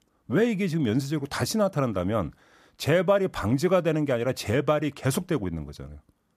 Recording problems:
none

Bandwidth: 14.5 kHz